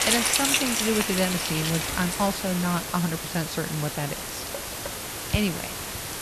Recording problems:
rain or running water; very loud; throughout; 1 dB above the speech
hiss; loud; throughout; 3 dB below the speech

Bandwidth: 13.5 kHz